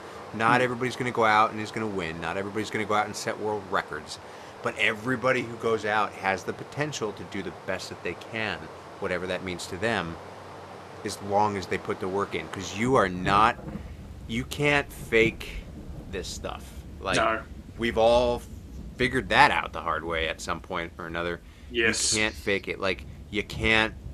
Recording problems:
rain or running water; noticeable; throughout; 15 dB below the speech

